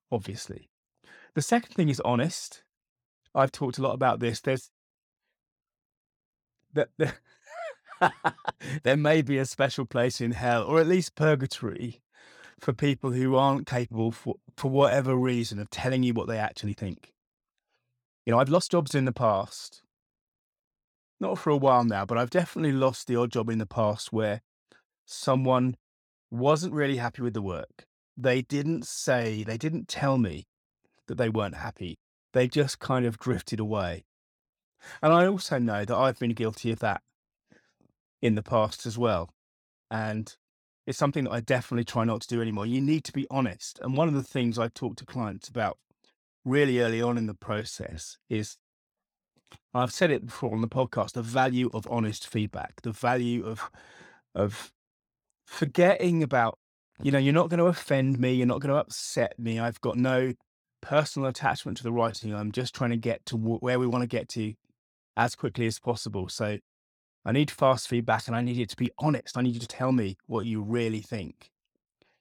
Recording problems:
uneven, jittery; strongly; from 8.5 s to 1:10

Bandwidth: 18 kHz